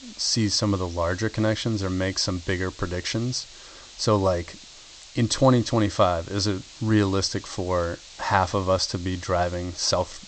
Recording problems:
high frequencies cut off; noticeable; nothing above 8 kHz
hiss; noticeable; throughout; 20 dB below the speech

